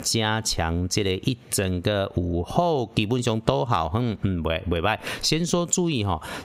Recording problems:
squashed, flat; somewhat

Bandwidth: 15.5 kHz